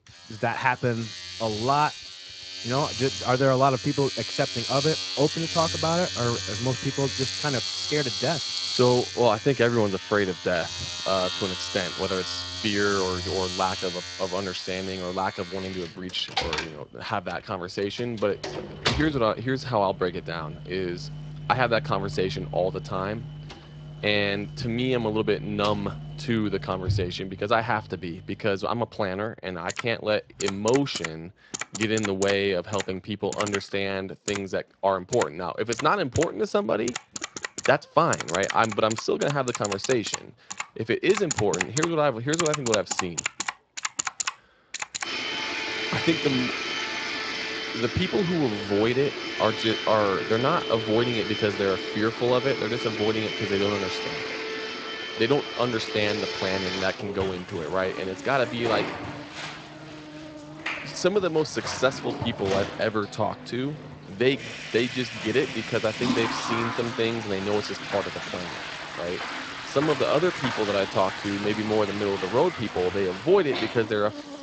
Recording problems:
garbled, watery; slightly; nothing above 7.5 kHz
household noises; loud; throughout; 5 dB below the speech
animal sounds; faint; throughout; 20 dB below the speech

